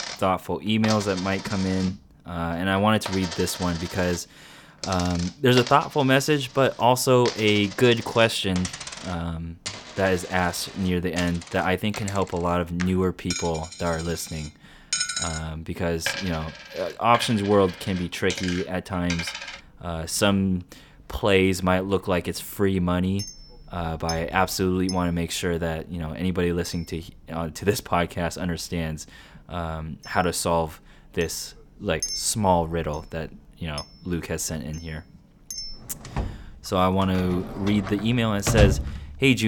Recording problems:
household noises; loud; throughout; 9 dB below the speech
abrupt cut into speech; at the end

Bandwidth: 18.5 kHz